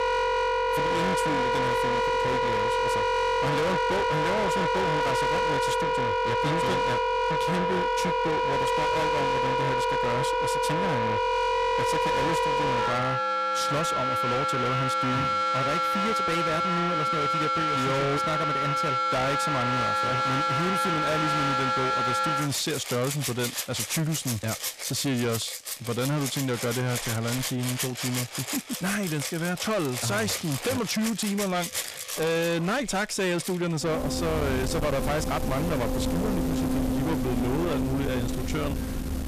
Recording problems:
distortion; heavy; 6 dB below the speech
background music; very loud; throughout; 2 dB above the speech

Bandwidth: 14.5 kHz